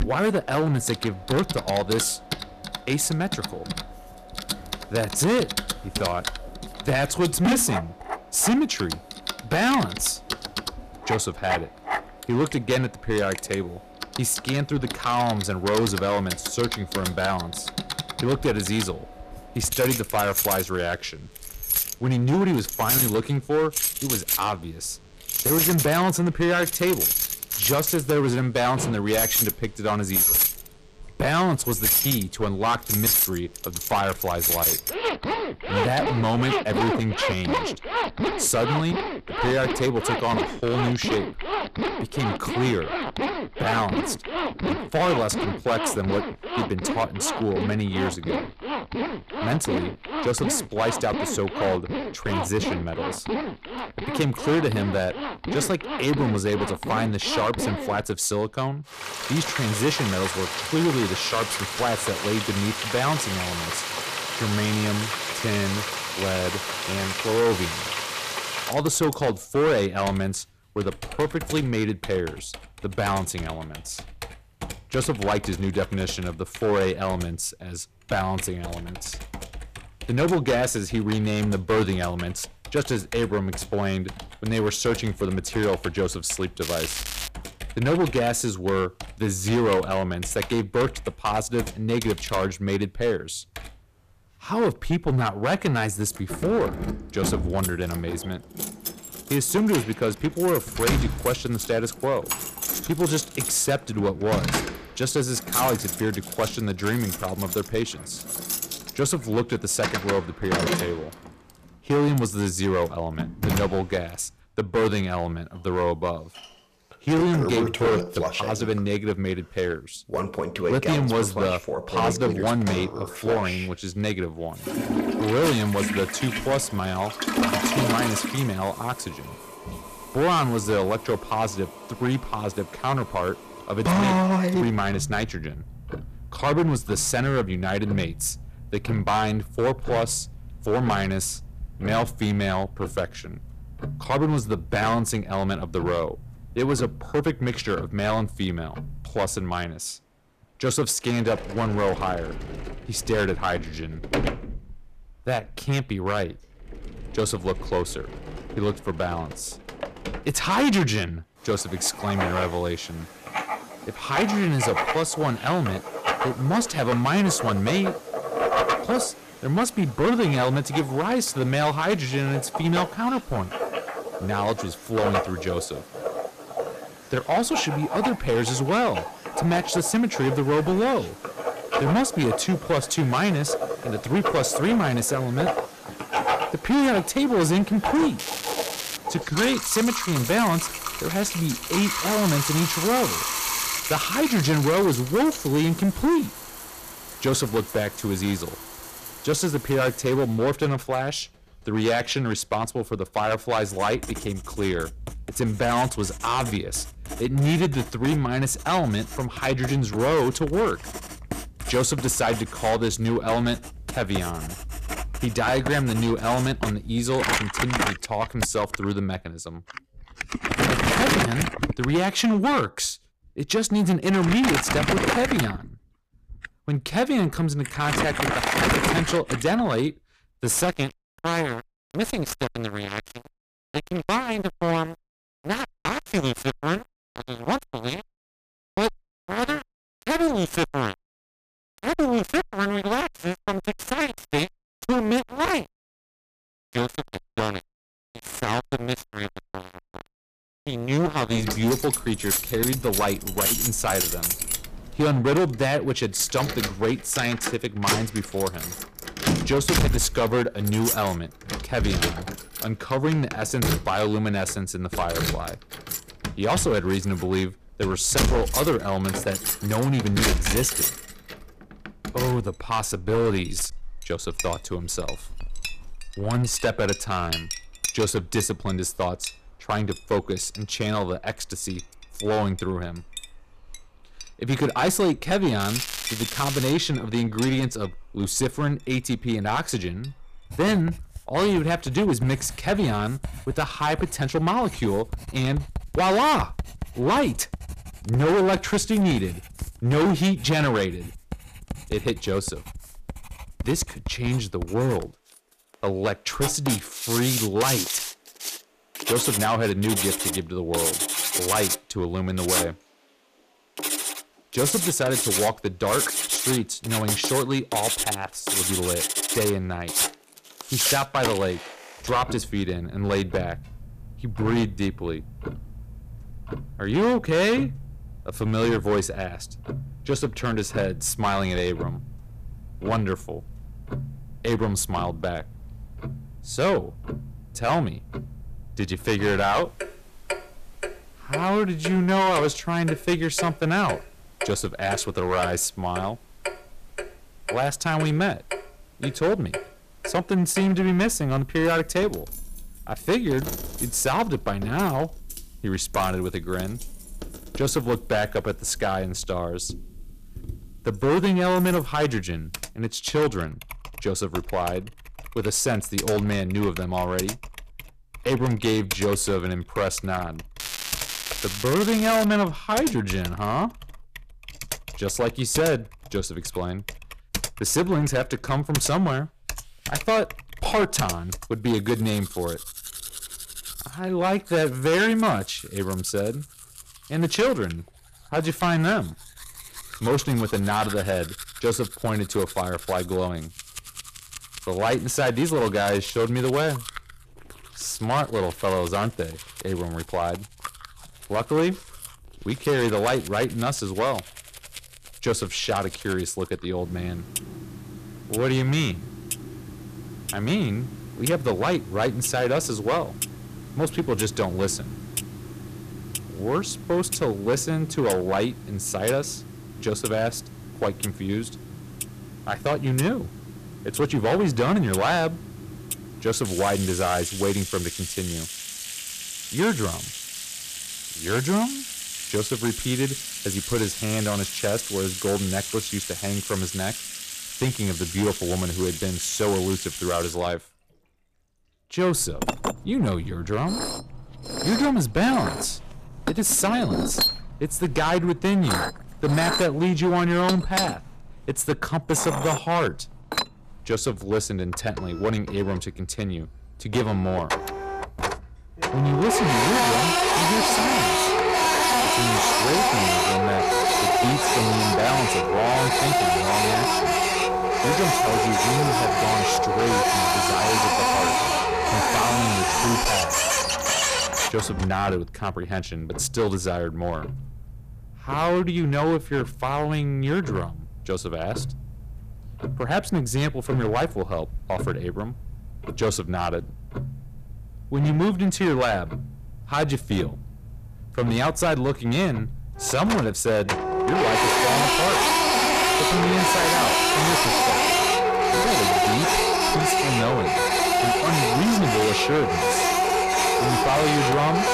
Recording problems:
distortion; heavy; 12% of the sound clipped
household noises; loud; throughout; 2 dB below the speech
crackling; loud; 4 times, first at 1:27; 6 dB below the speech

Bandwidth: 14.5 kHz